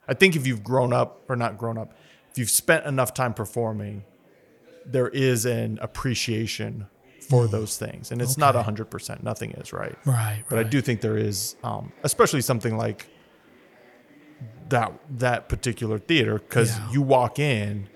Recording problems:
murmuring crowd; faint; throughout; 30 dB below the speech

